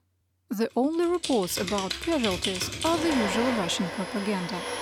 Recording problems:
household noises; loud; from 1.5 s on; 4 dB below the speech

